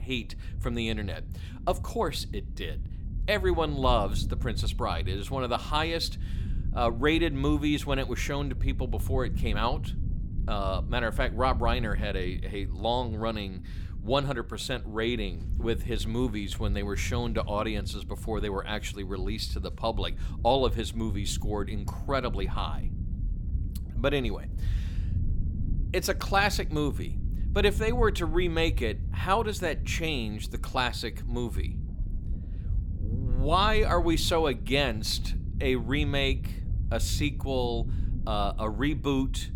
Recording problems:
low rumble; noticeable; throughout; 20 dB below the speech

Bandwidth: 18.5 kHz